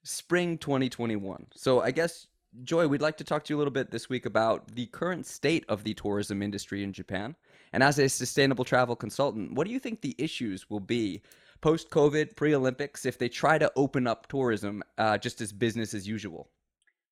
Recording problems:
none

